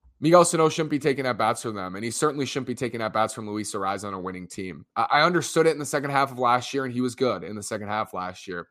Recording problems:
none

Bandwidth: 14.5 kHz